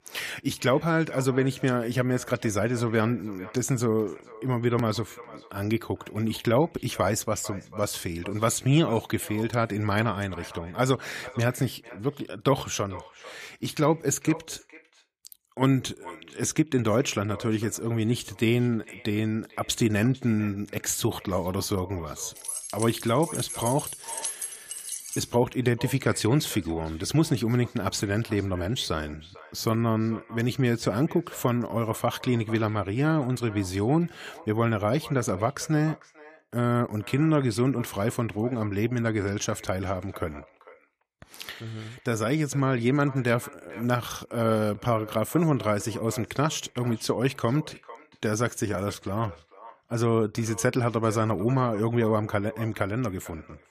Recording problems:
echo of what is said; faint; throughout; 450 ms later, 20 dB below the speech
jangling keys; noticeable; from 22 to 25 s; peak 4 dB below the speech

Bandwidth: 14.5 kHz